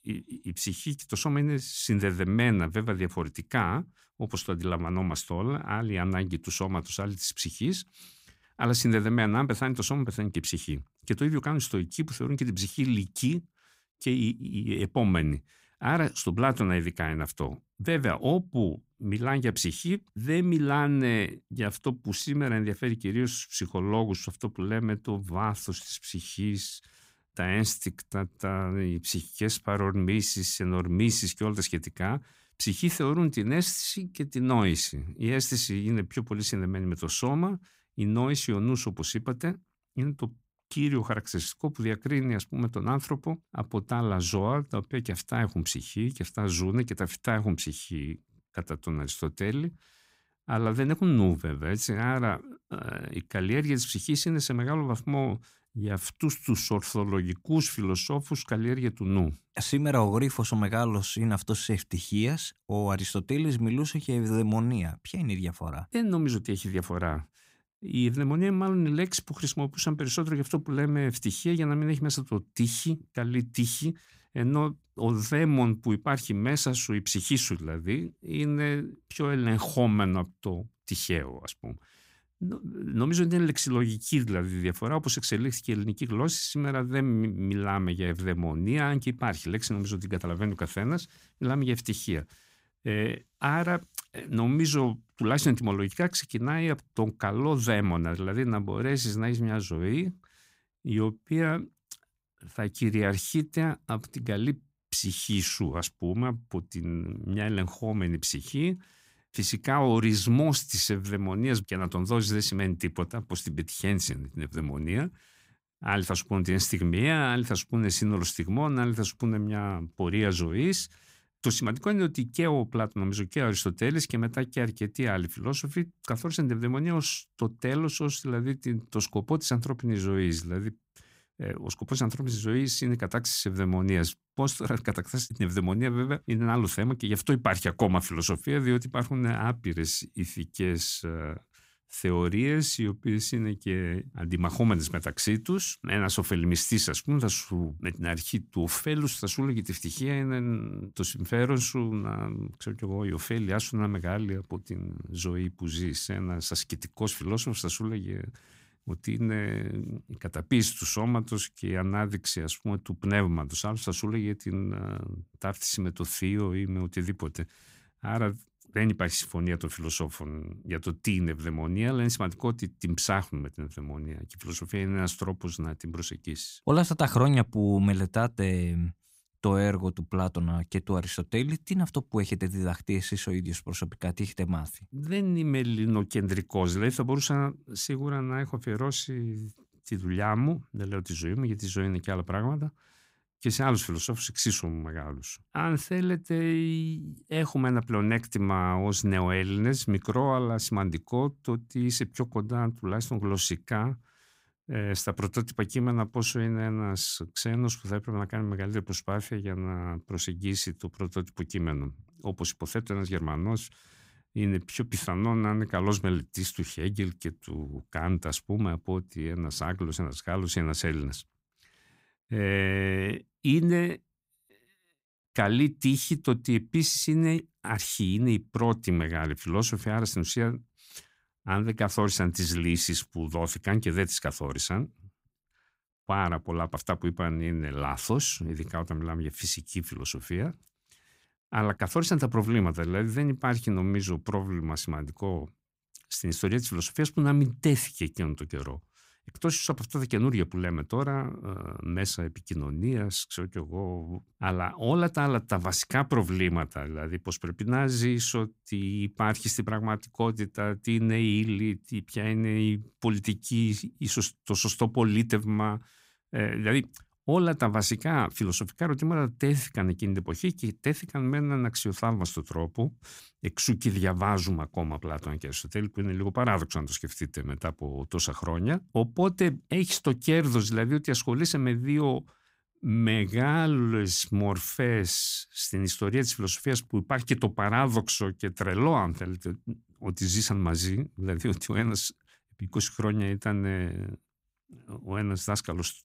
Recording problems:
none

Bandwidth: 15.5 kHz